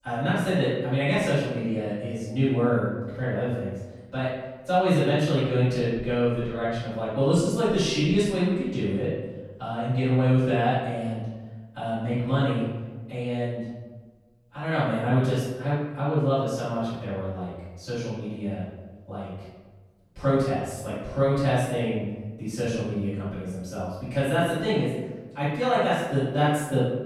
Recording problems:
room echo; strong; dies away in 1.1 s
off-mic speech; far

